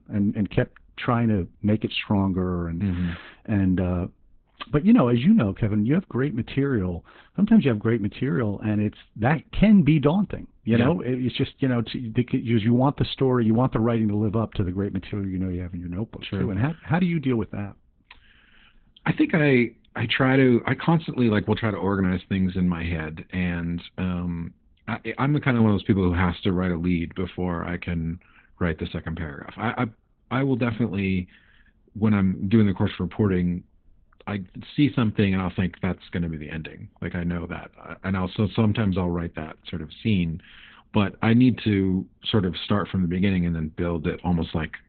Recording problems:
garbled, watery; badly; nothing above 4 kHz
muffled; very slightly; fading above 3.5 kHz

